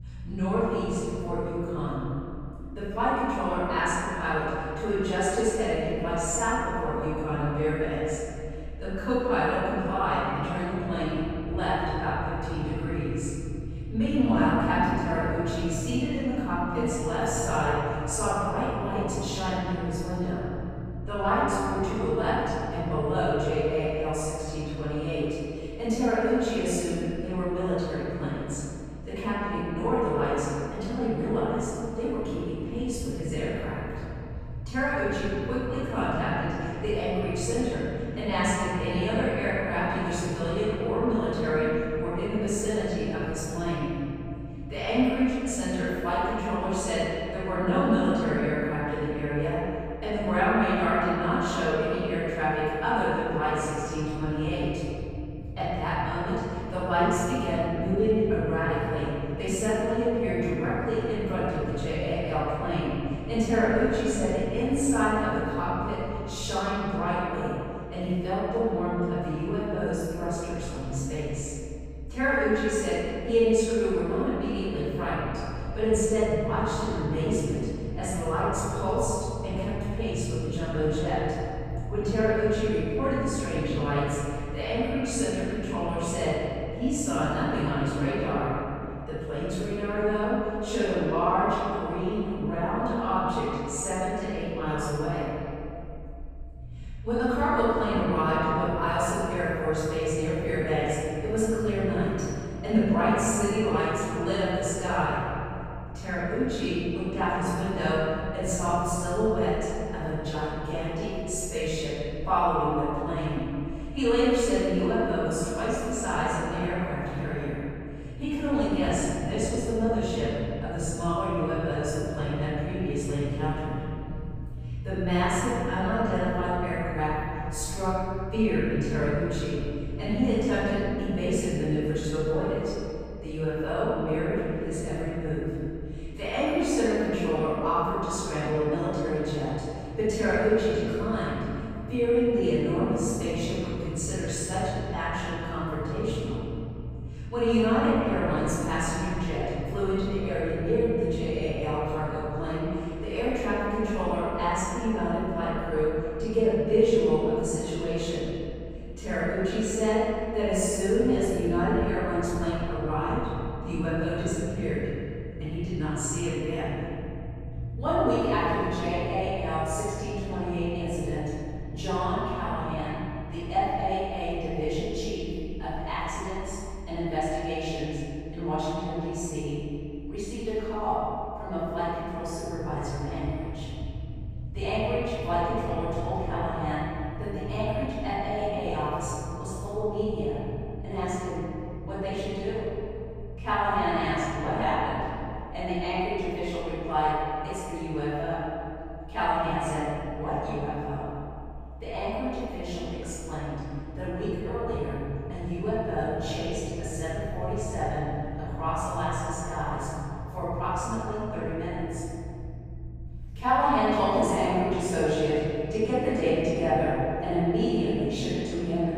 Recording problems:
room echo; strong; dies away in 2.7 s
off-mic speech; far
low rumble; faint; throughout; 25 dB below the speech

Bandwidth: 15.5 kHz